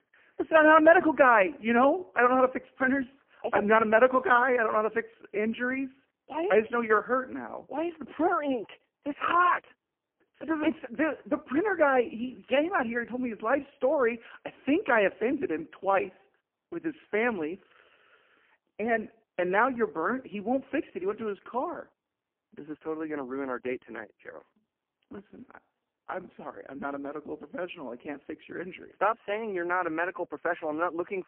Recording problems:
phone-call audio; poor line

